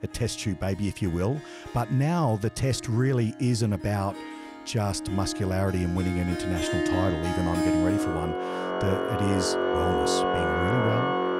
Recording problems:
background music; very loud; throughout; as loud as the speech

